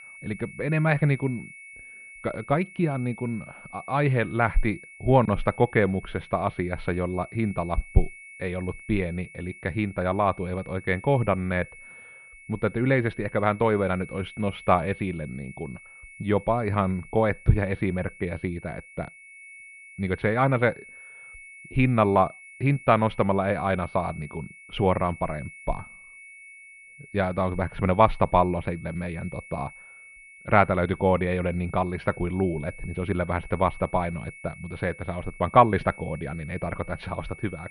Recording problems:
muffled; very; fading above 2.5 kHz
high-pitched whine; noticeable; throughout; 2 kHz, 20 dB below the speech

